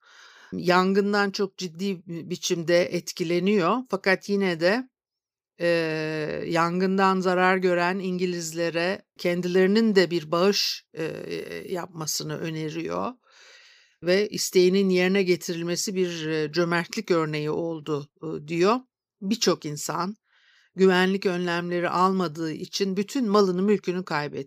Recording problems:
none

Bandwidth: 15 kHz